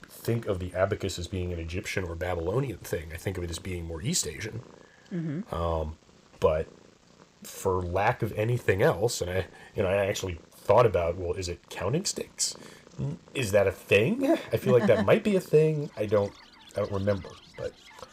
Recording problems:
animal sounds; faint; throughout; 25 dB below the speech

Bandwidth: 15.5 kHz